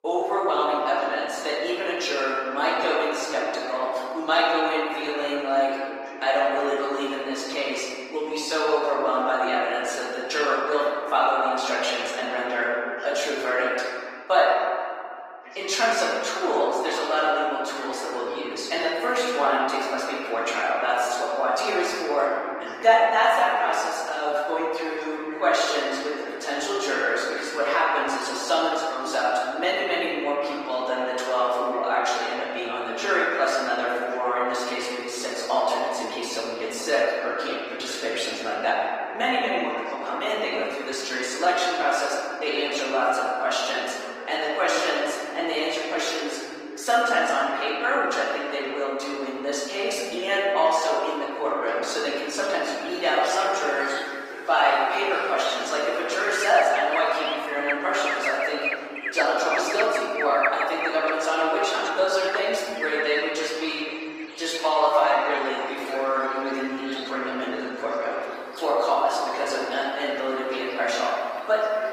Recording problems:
room echo; strong; dies away in 2.2 s
off-mic speech; far
thin; somewhat; fading below 450 Hz
garbled, watery; slightly; nothing above 15.5 kHz
voice in the background; noticeable; throughout; 15 dB below the speech
animal sounds; very faint; from 52 s on; 10 dB below the speech

